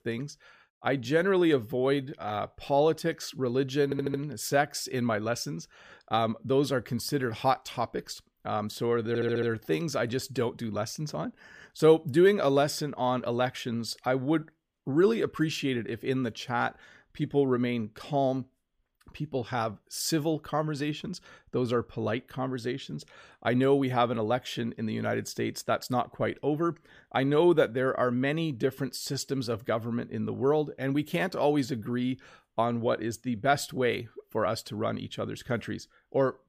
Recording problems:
audio stuttering; at 4 s and at 9 s

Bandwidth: 15 kHz